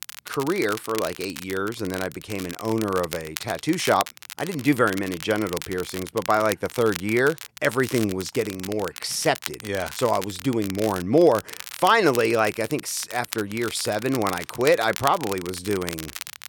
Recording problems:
crackle, like an old record; noticeable; 10 dB below the speech

